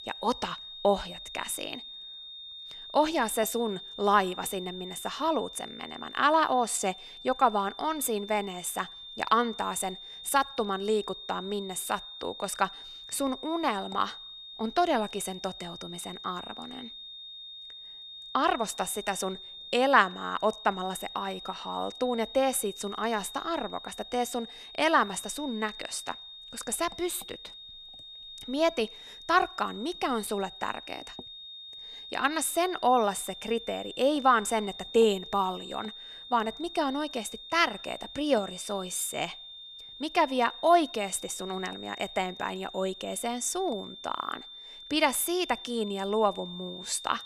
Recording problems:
high-pitched whine; noticeable; throughout; 3.5 kHz, 10 dB below the speech

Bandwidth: 14 kHz